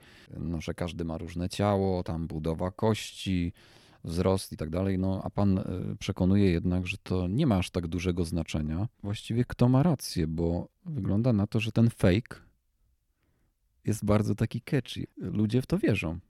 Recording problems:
uneven, jittery; strongly; from 2 to 16 s

